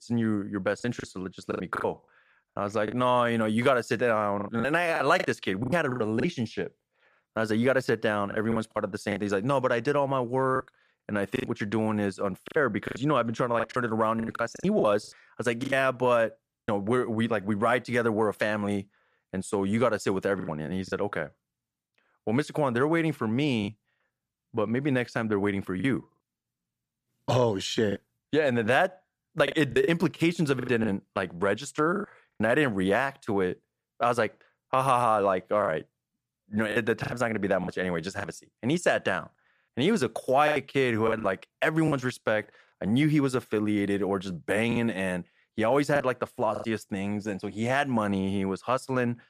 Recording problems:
choppy; very; 7% of the speech affected

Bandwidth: 14.5 kHz